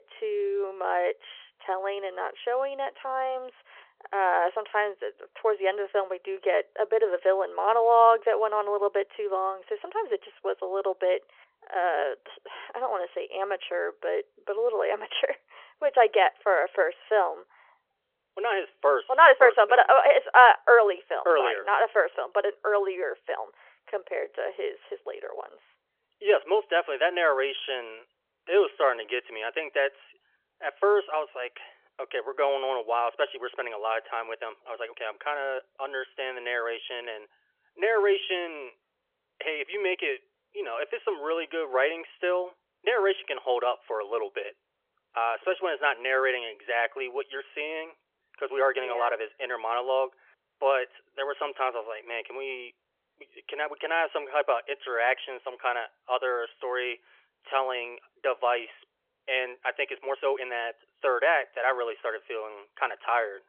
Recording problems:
phone-call audio; nothing above 3.5 kHz
uneven, jittery; strongly; from 16 s to 1:01

